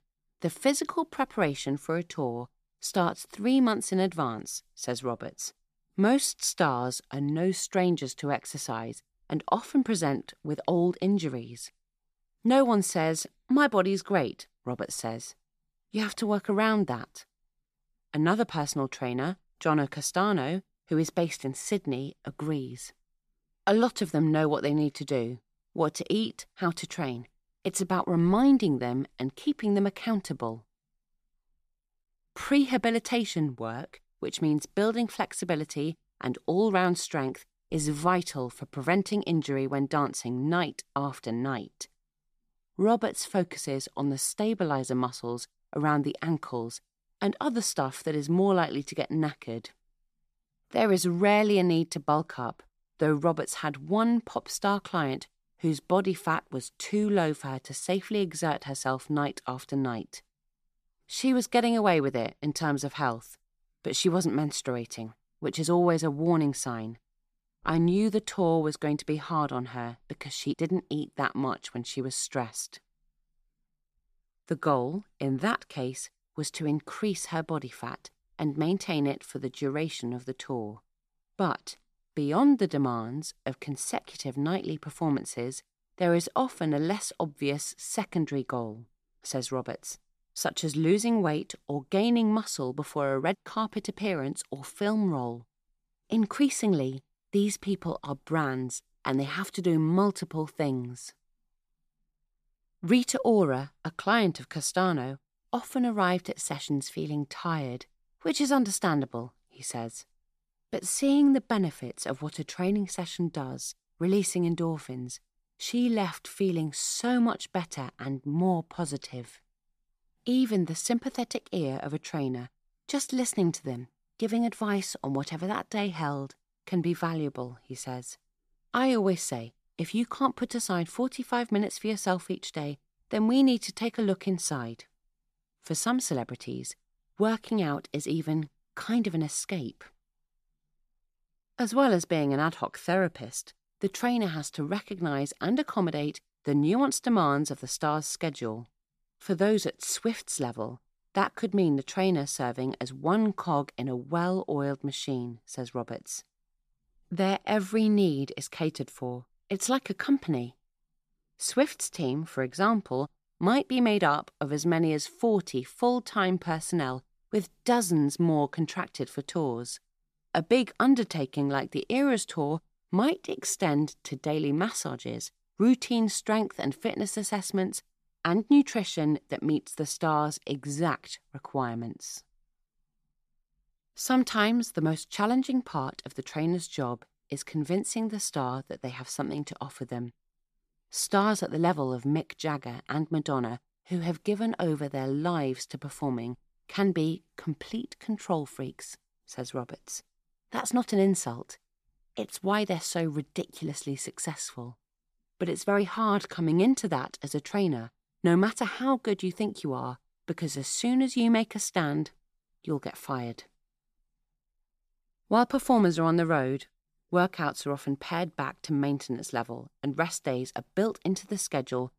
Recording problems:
none

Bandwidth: 14.5 kHz